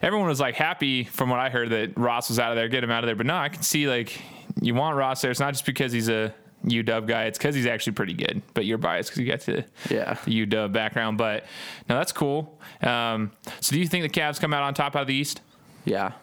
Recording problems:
squashed, flat; heavily

